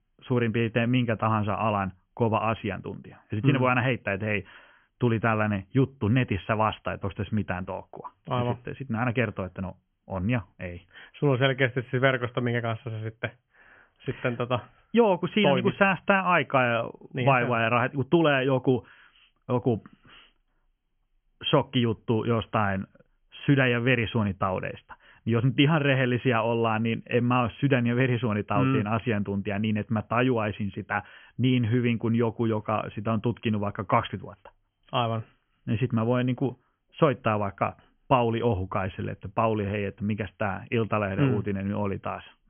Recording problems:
high frequencies cut off; severe; nothing above 3.5 kHz

